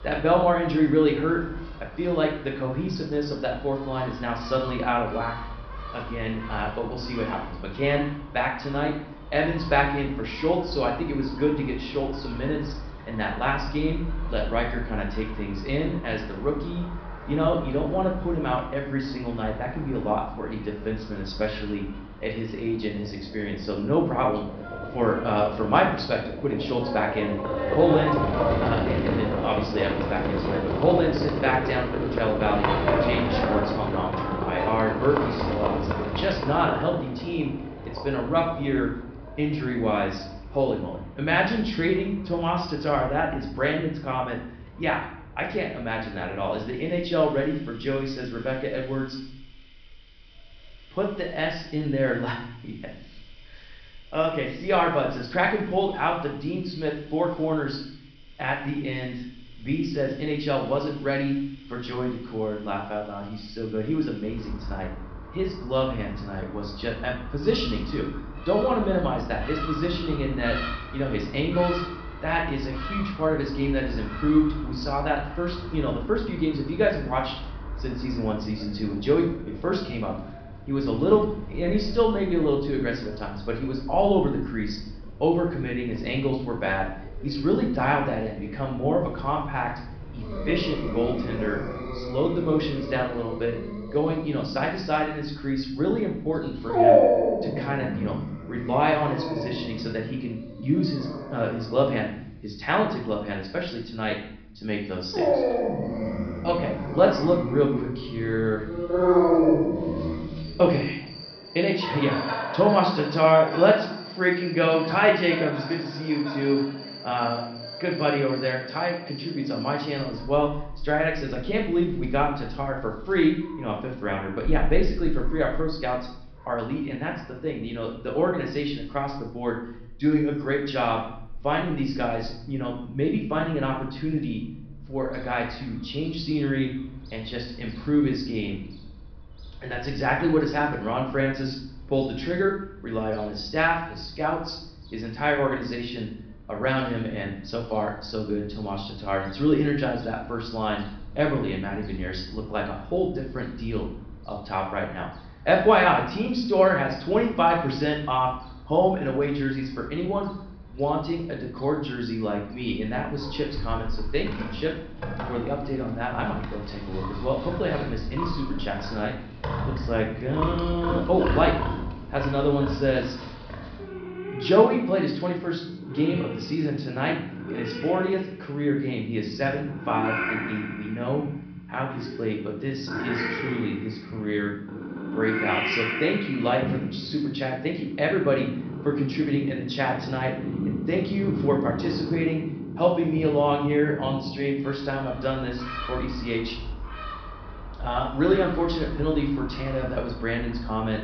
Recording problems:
high frequencies cut off; noticeable; nothing above 5.5 kHz
room echo; slight; dies away in 0.6 s
off-mic speech; somewhat distant
animal sounds; loud; throughout; 6 dB below the speech

